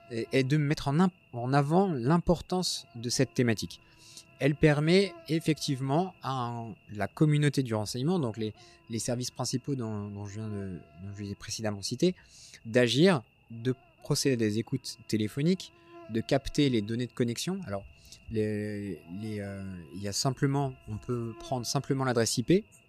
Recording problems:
electrical hum; faint; throughout; 50 Hz, 25 dB below the speech

